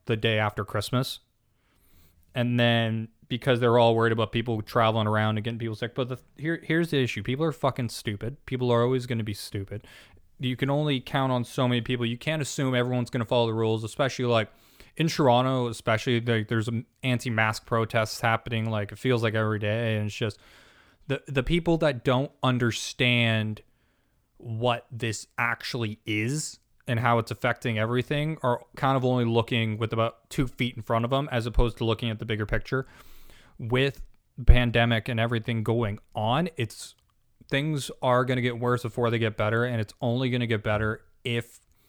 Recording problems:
none

